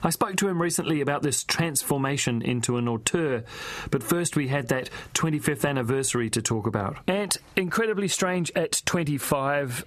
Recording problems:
squashed, flat; somewhat

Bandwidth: 14 kHz